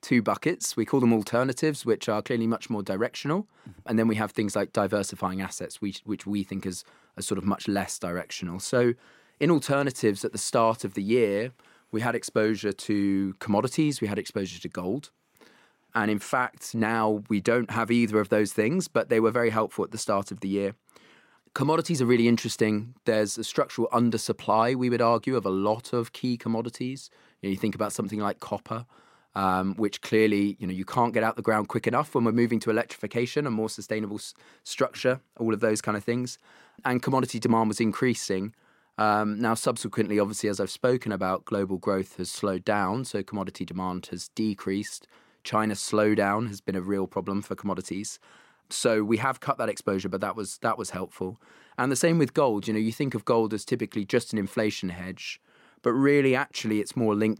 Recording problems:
none

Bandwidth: 16 kHz